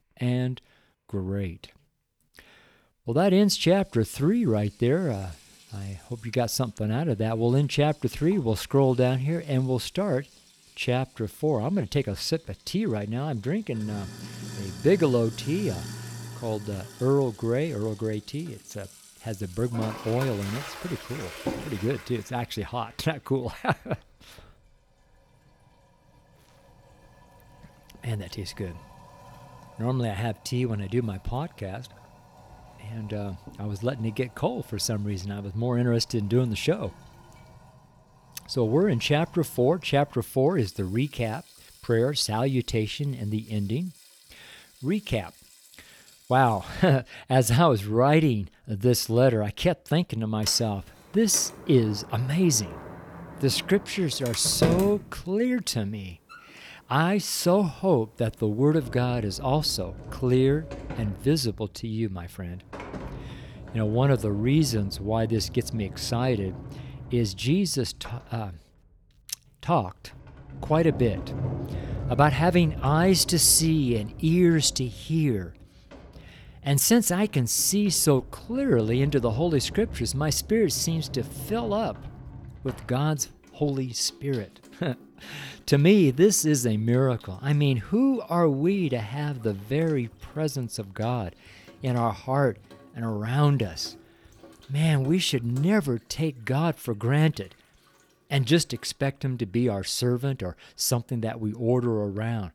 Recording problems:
household noises; noticeable; throughout; 15 dB below the speech

